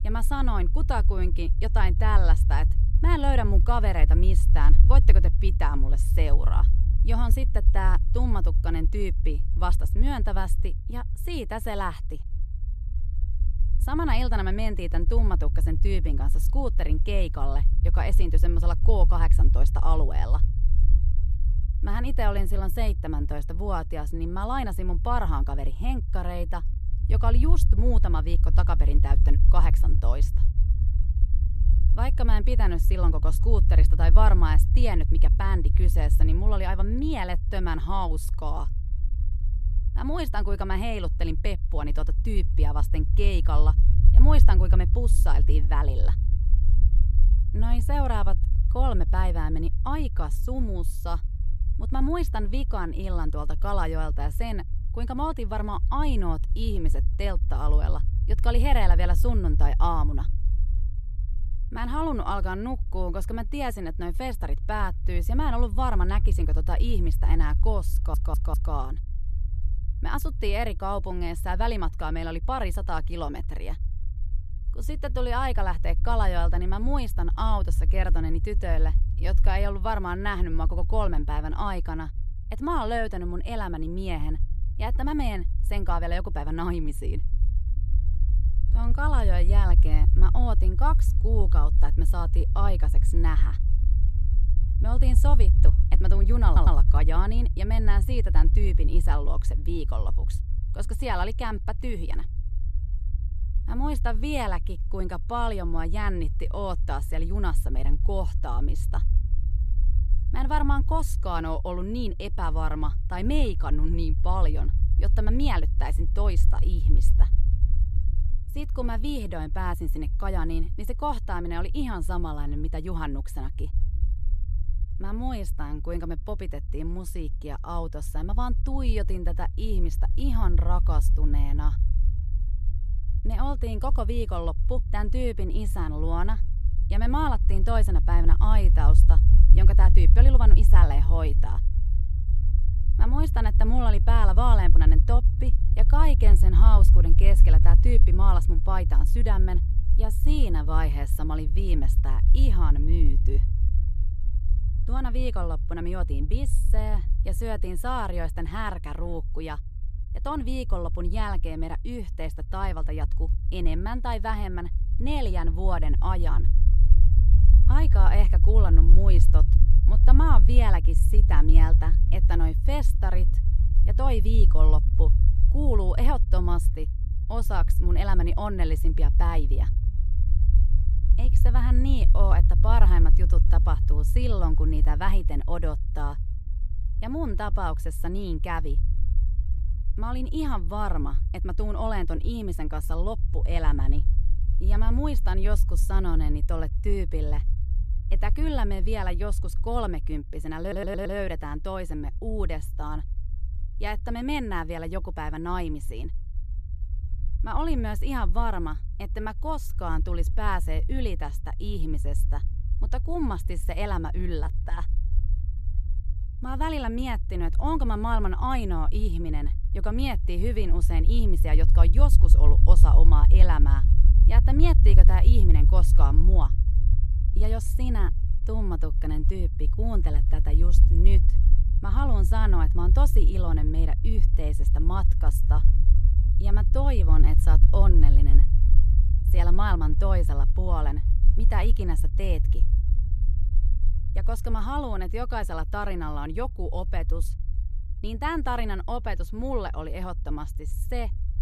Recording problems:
low rumble; noticeable; throughout; 15 dB below the speech
audio stuttering; at 1:08, at 1:36 and at 3:21

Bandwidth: 14.5 kHz